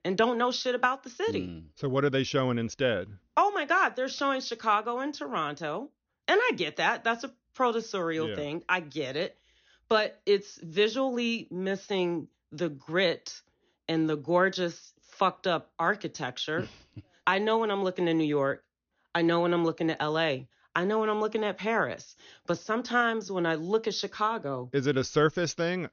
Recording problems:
high frequencies cut off; noticeable; nothing above 6.5 kHz

